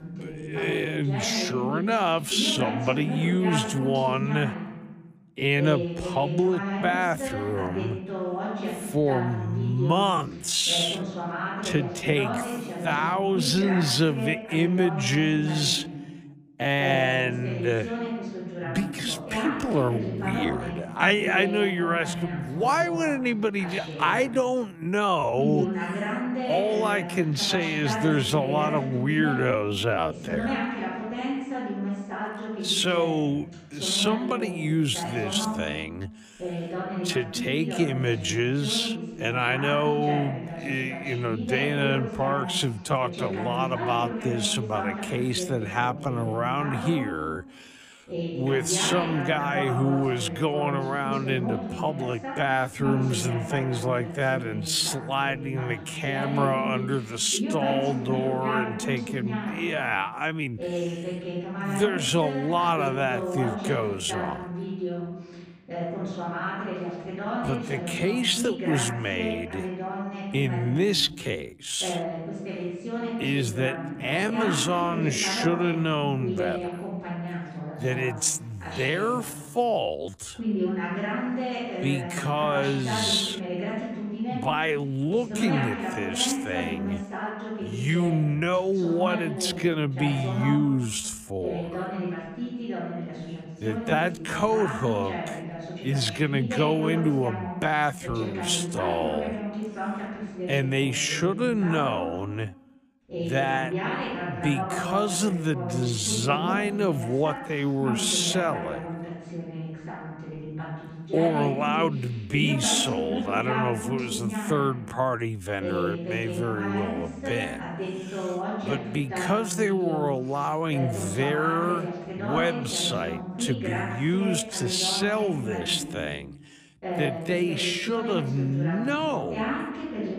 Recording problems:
wrong speed, natural pitch; too slow; 0.5 times normal speed
voice in the background; loud; throughout; 6 dB below the speech

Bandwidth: 15 kHz